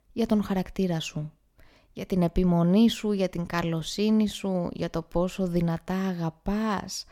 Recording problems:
none

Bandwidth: 18 kHz